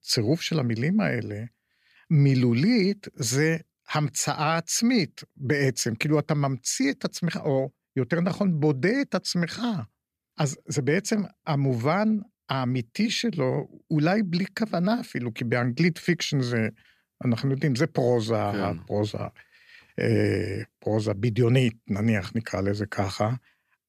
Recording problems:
none

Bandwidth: 14.5 kHz